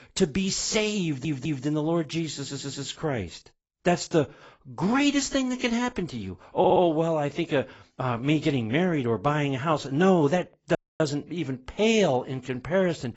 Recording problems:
garbled, watery; badly; nothing above 7.5 kHz
audio stuttering; at 1 s, at 2.5 s and at 6.5 s
audio cutting out; at 11 s

